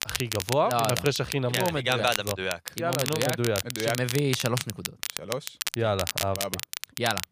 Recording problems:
crackle, like an old record; loud; 5 dB below the speech

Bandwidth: 15 kHz